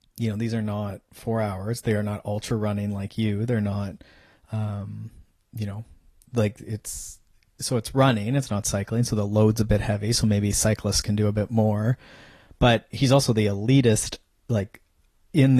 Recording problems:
garbled, watery; slightly; nothing above 14 kHz
abrupt cut into speech; at the end

